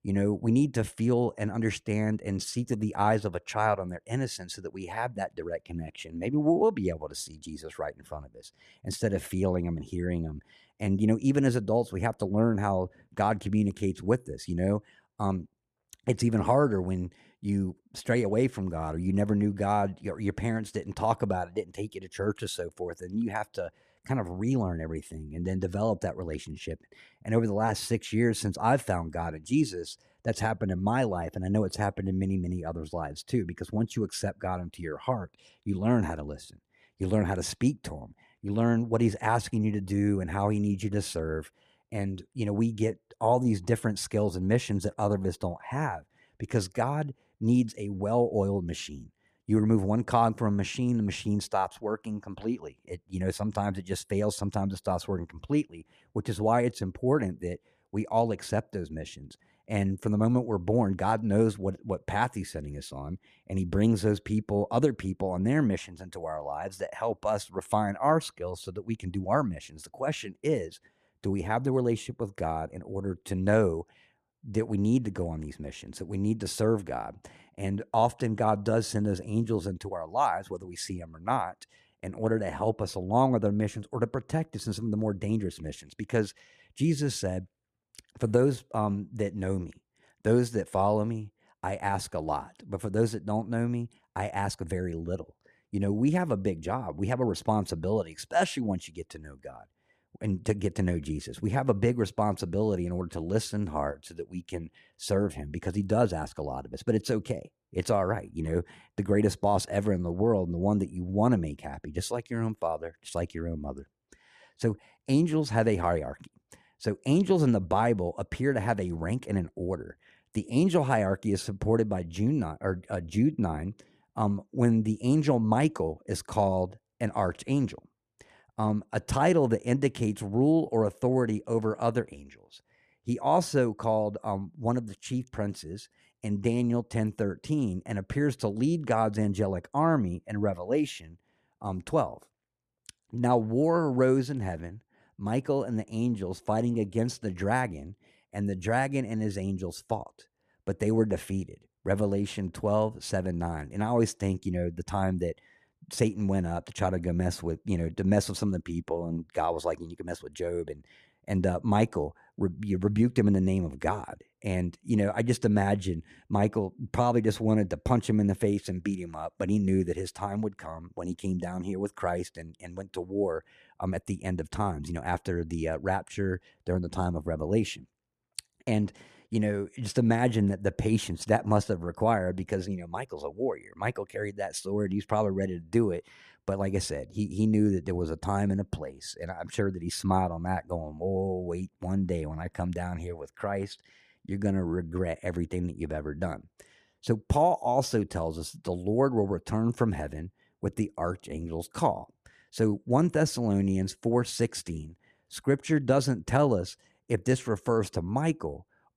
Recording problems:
none

